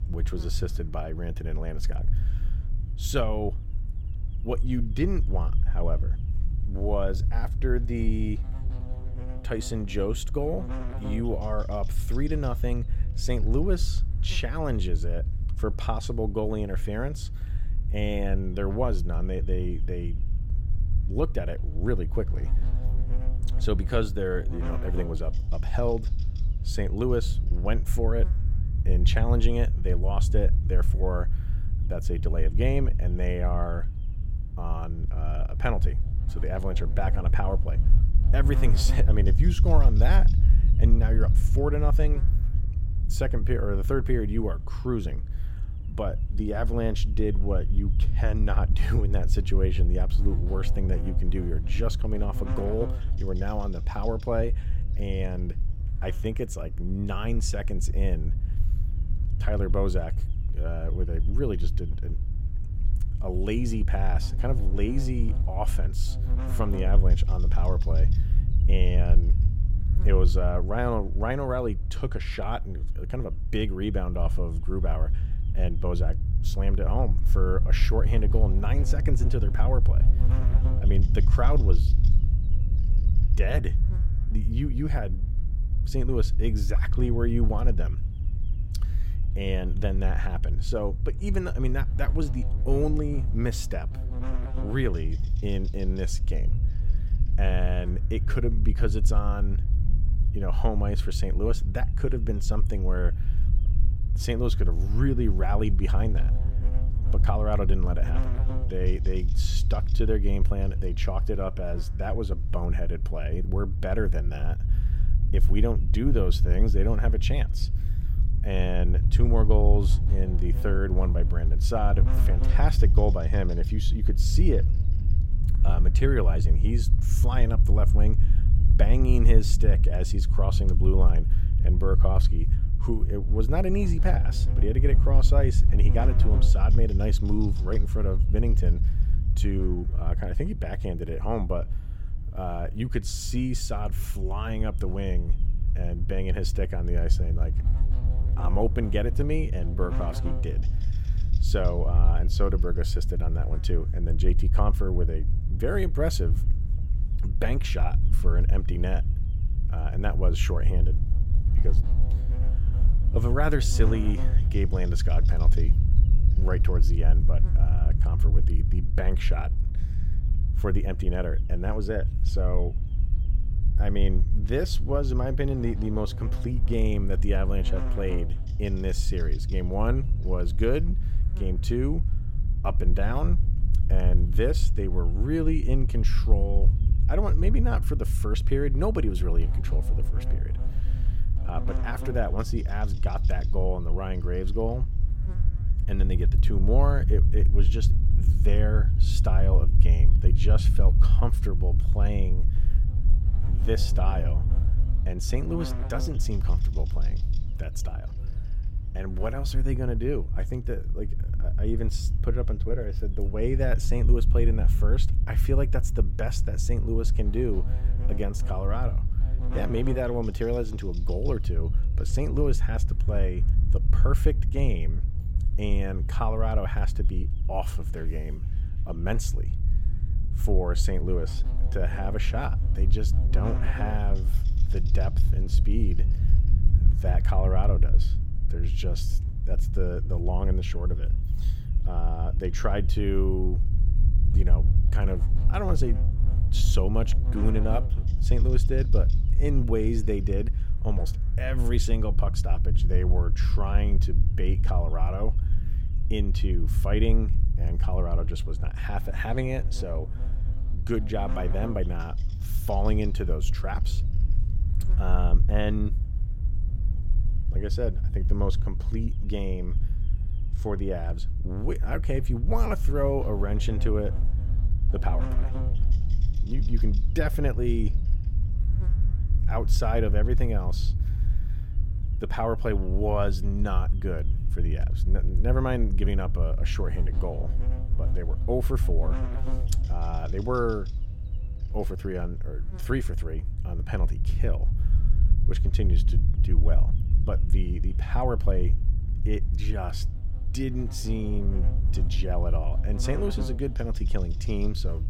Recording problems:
electrical hum; noticeable; throughout; 50 Hz, 20 dB below the speech
low rumble; noticeable; throughout; 10 dB below the speech

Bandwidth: 16.5 kHz